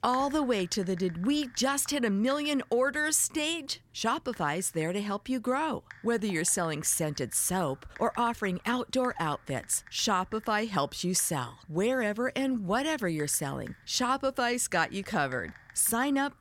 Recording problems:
household noises; faint; throughout; 25 dB below the speech

